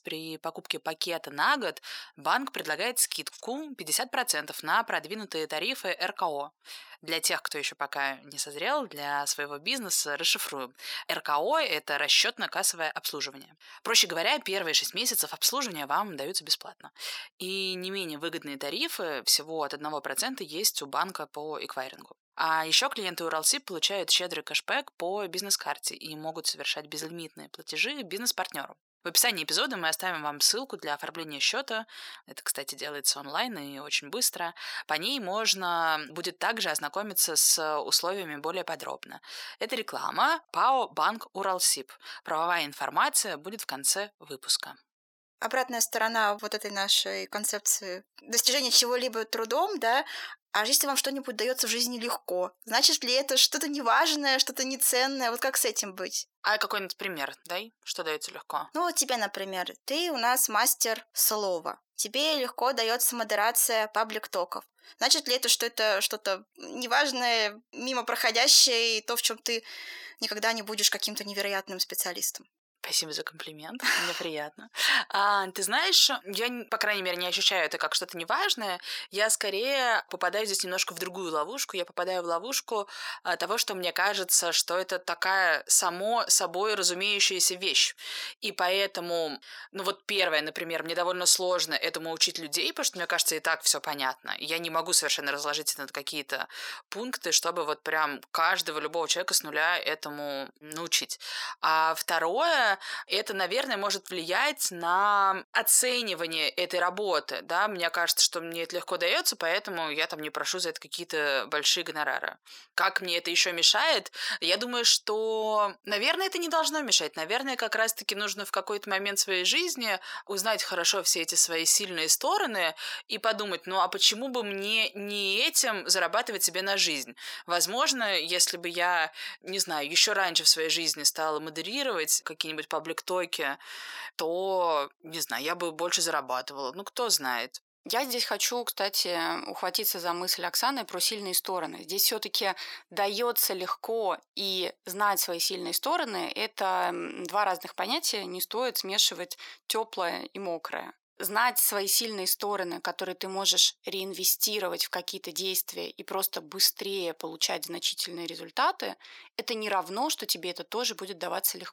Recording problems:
thin; very; fading below 700 Hz

